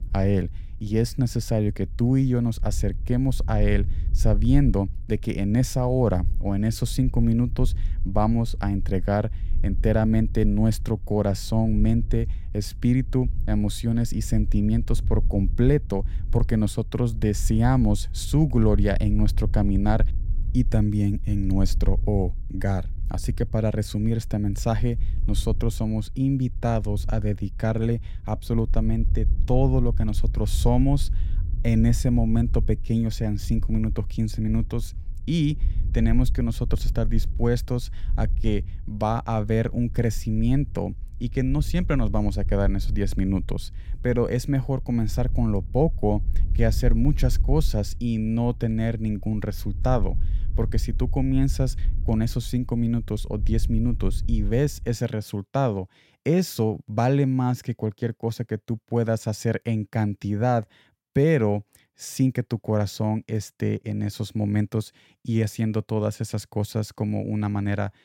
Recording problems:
low rumble; faint; until 55 s; 20 dB below the speech

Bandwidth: 16.5 kHz